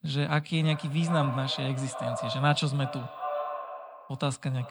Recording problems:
echo of what is said; strong; throughout; 380 ms later, 8 dB below the speech

